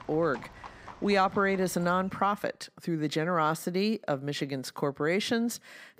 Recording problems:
animal sounds; noticeable; until 2 s; 20 dB below the speech

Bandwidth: 15.5 kHz